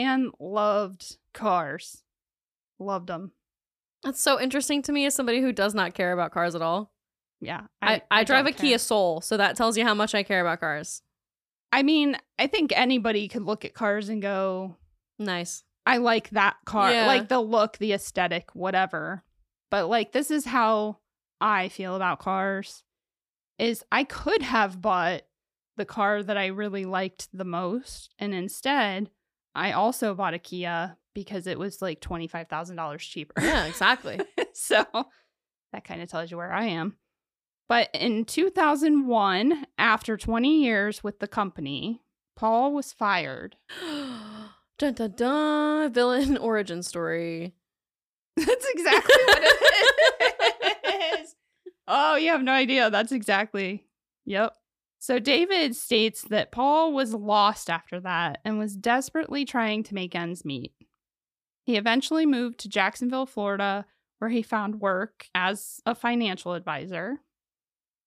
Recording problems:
abrupt cut into speech; at the start

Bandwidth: 15 kHz